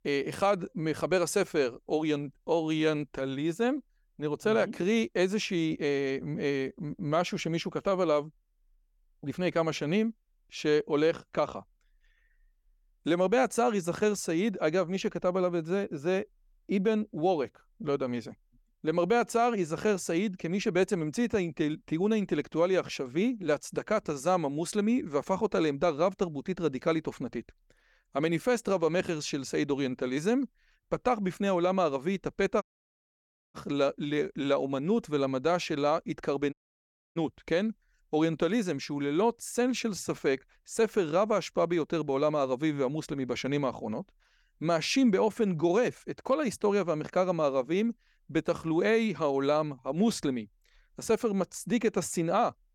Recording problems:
audio cutting out; at 33 s for 1 s and at 37 s for 0.5 s

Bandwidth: 18 kHz